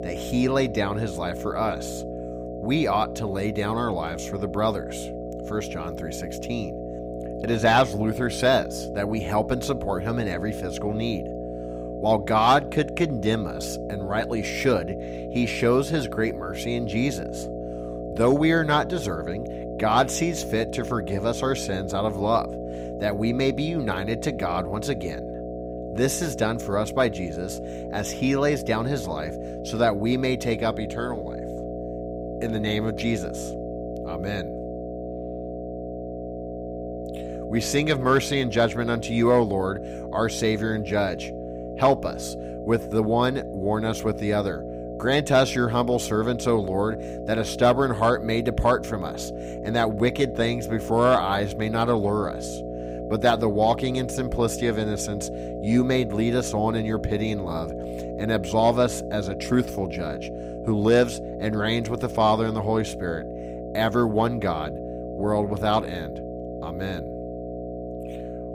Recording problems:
electrical hum; loud; throughout; 60 Hz, 9 dB below the speech

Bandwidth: 15.5 kHz